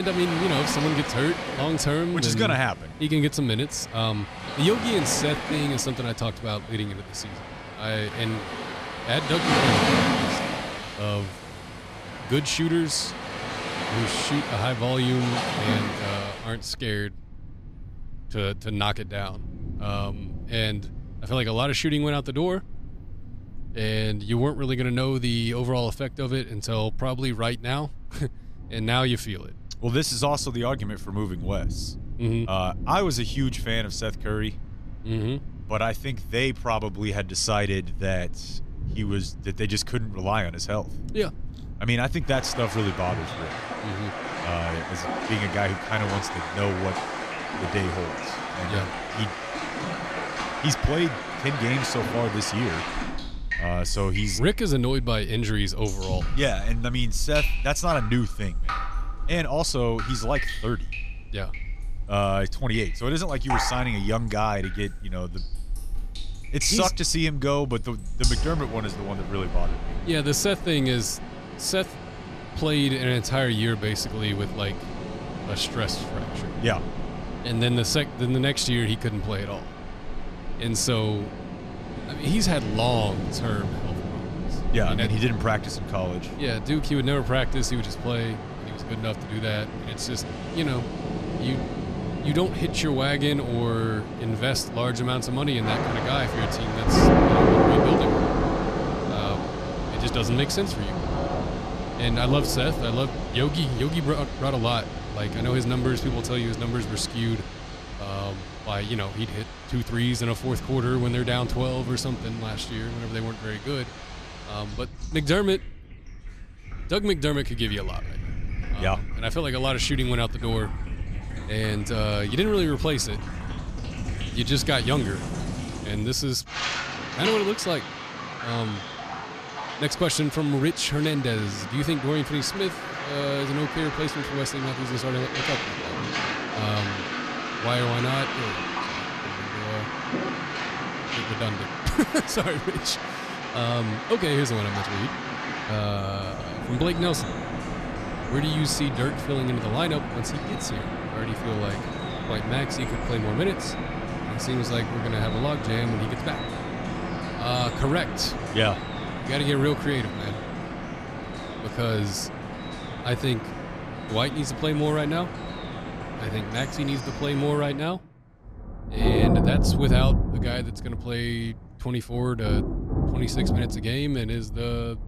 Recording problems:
rain or running water; loud; throughout; 4 dB below the speech
abrupt cut into speech; at the start

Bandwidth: 14 kHz